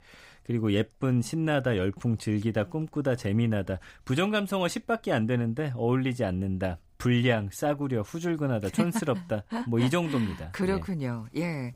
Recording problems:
none

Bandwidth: 15.5 kHz